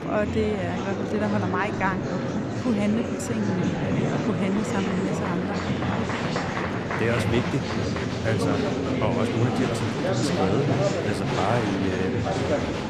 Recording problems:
murmuring crowd; very loud; throughout; 2 dB above the speech

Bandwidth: 15 kHz